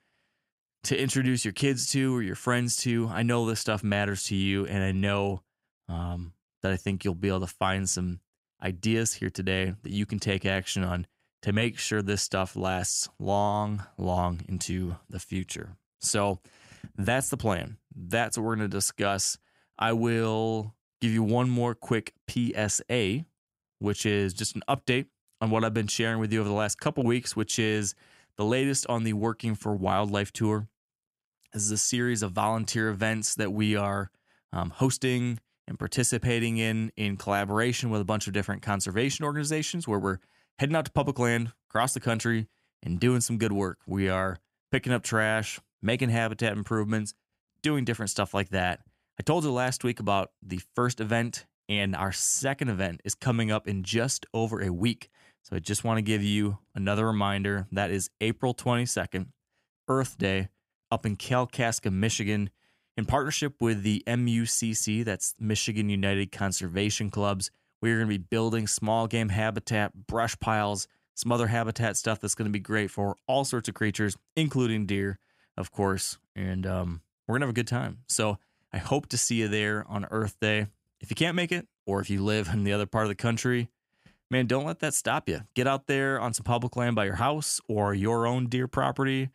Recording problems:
none

